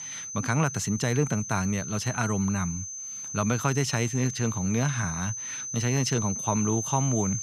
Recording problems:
high-pitched whine; loud; throughout; 6 kHz, 5 dB below the speech

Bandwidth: 14.5 kHz